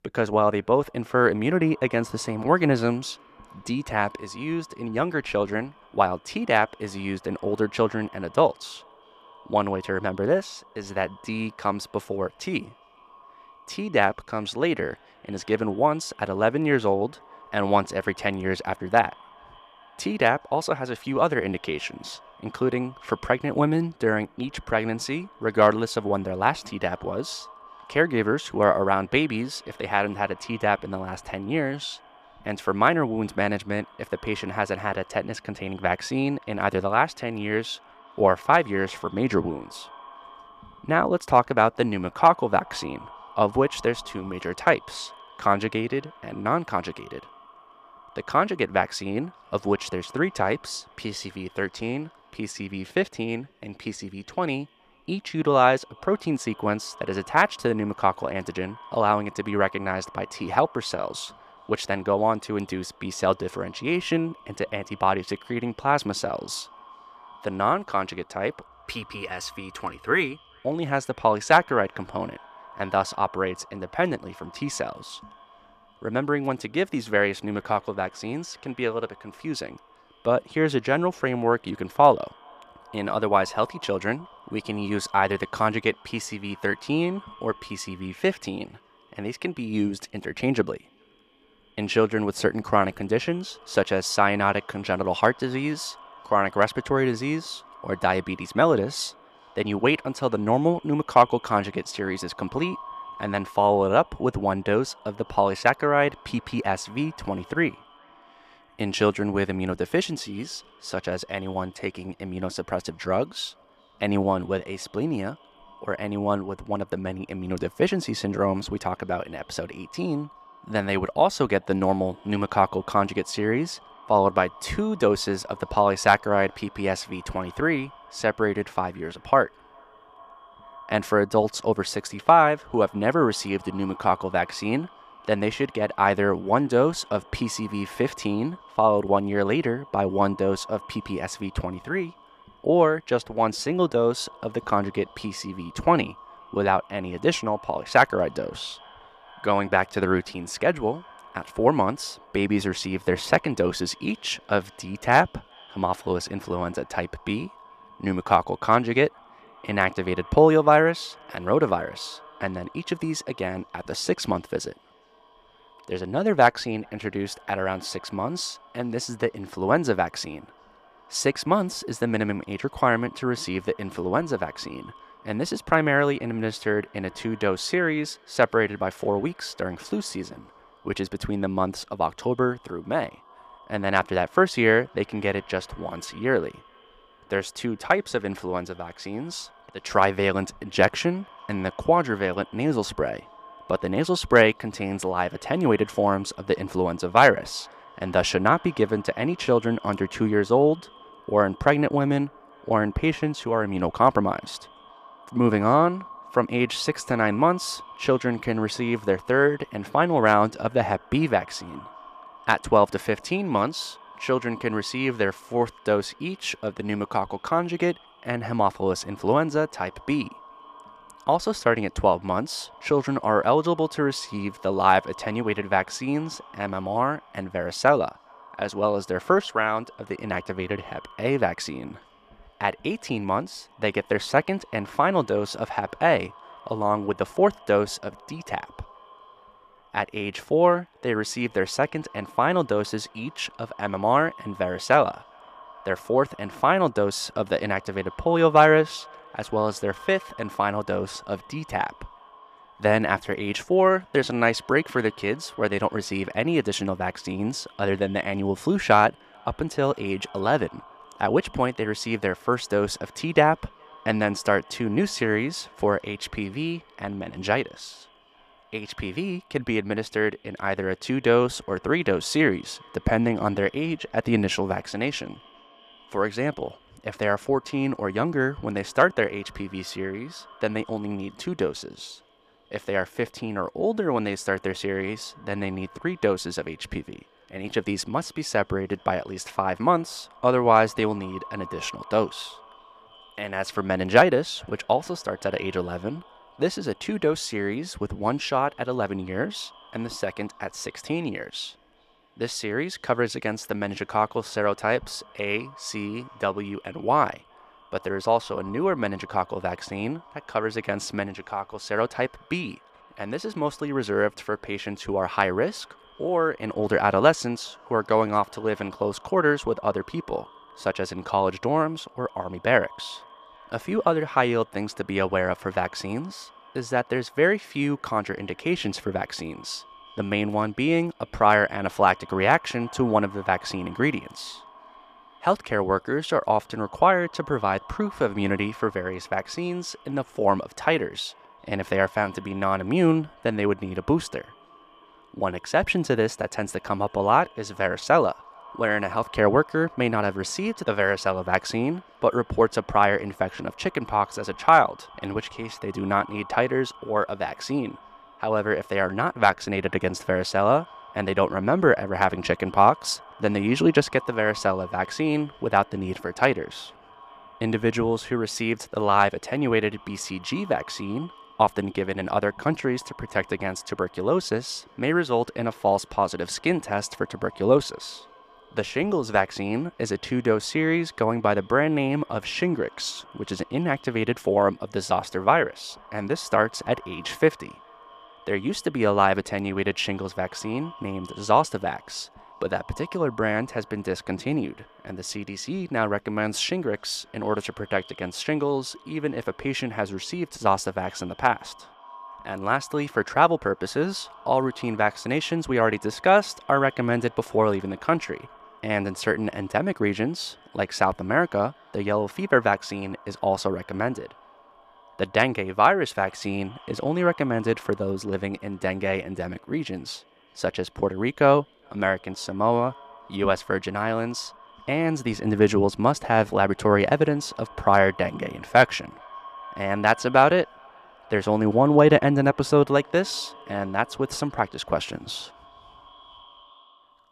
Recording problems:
echo of what is said; faint; throughout; 410 ms later, 25 dB below the speech

